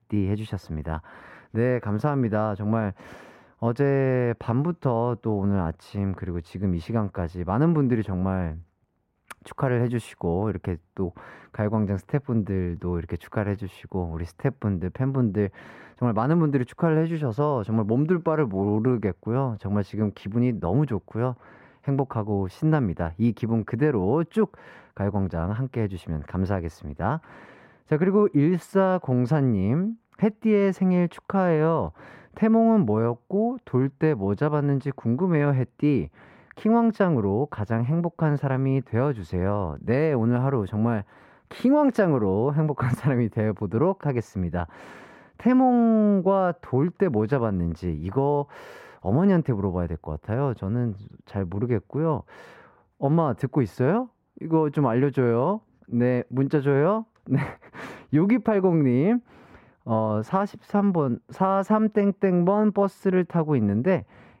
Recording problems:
muffled; slightly; fading above 3 kHz

